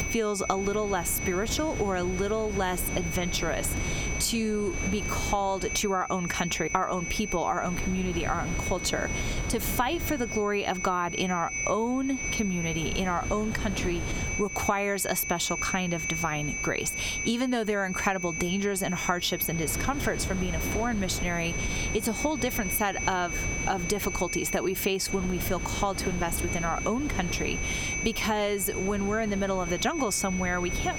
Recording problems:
squashed, flat; heavily
high-pitched whine; loud; throughout; 2.5 kHz, 6 dB below the speech
wind noise on the microphone; occasional gusts; 15 dB below the speech

